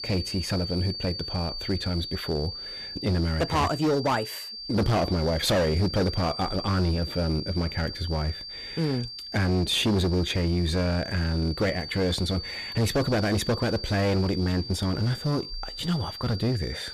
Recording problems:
distortion; heavy; 14% of the sound clipped
high-pitched whine; loud; throughout; 4.5 kHz, 8 dB below the speech

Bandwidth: 14.5 kHz